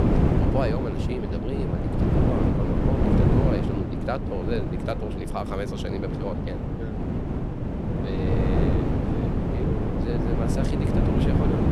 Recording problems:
wind noise on the microphone; heavy; 3 dB above the speech

